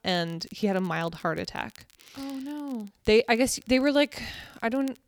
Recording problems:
crackle, like an old record; faint; 30 dB below the speech

